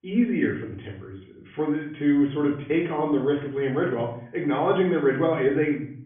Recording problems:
off-mic speech; far
high frequencies cut off; severe; nothing above 3.5 kHz
room echo; slight; dies away in 0.5 s

